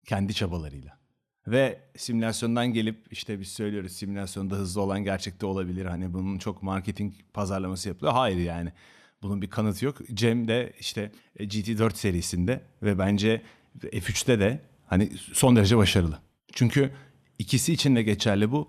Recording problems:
none

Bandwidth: 13.5 kHz